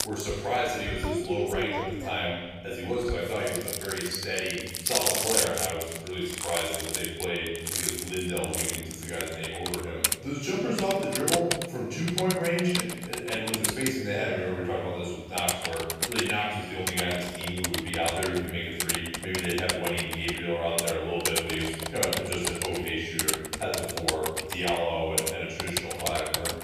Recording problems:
room echo; strong; dies away in 1.3 s
off-mic speech; far
household noises; loud; throughout; 1 dB below the speech

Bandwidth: 15 kHz